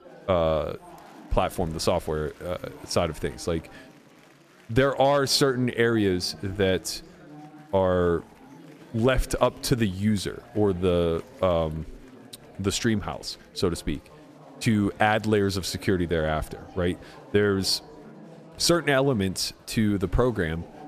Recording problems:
chatter from many people; faint; throughout; 20 dB below the speech

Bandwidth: 14.5 kHz